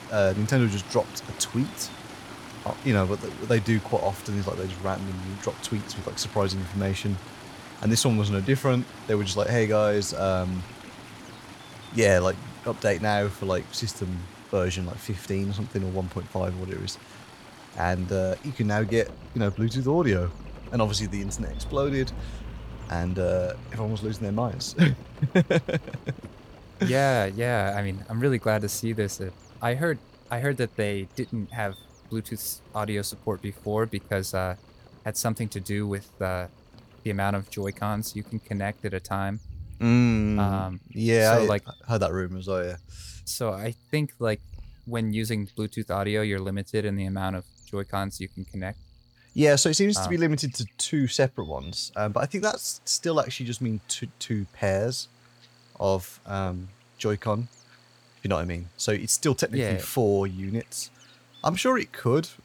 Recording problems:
rain or running water; noticeable; throughout; 15 dB below the speech
electrical hum; faint; throughout; 60 Hz, 30 dB below the speech

